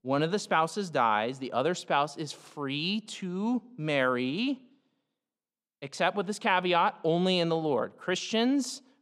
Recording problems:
none

